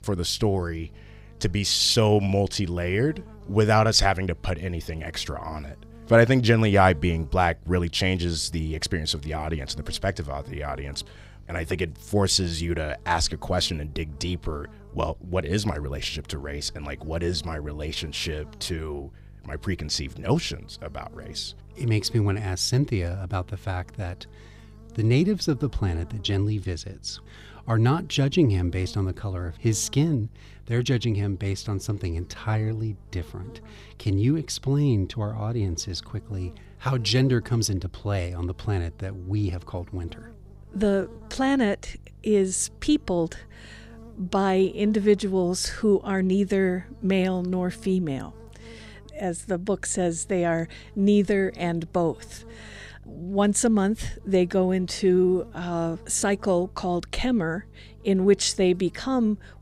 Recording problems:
electrical hum; faint; throughout; 50 Hz, 25 dB below the speech

